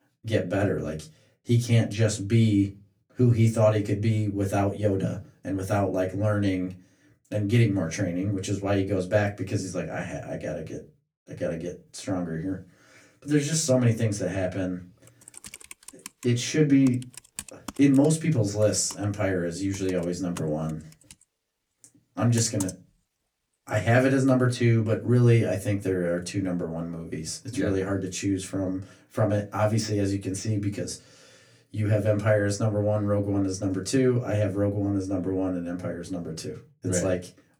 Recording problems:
off-mic speech; far
room echo; very slight; dies away in 0.2 s
keyboard typing; noticeable; from 15 to 24 s; peak 10 dB below the speech

